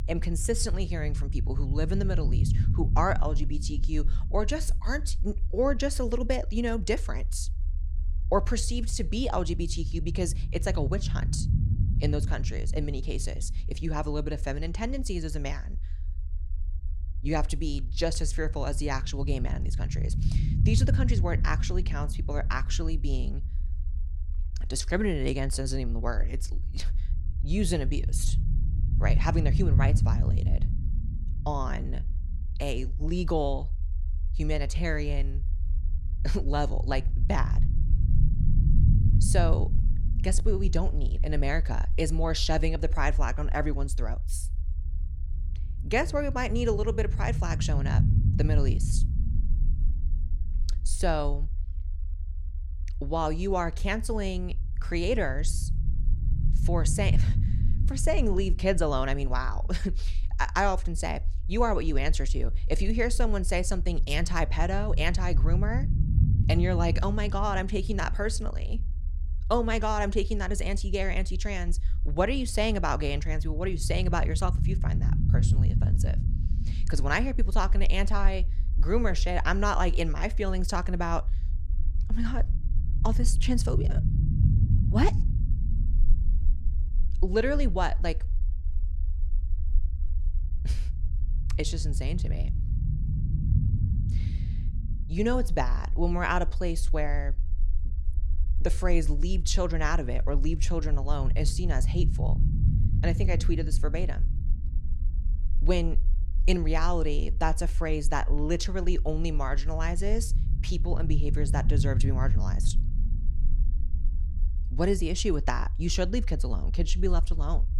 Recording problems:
low rumble; noticeable; throughout; 15 dB below the speech

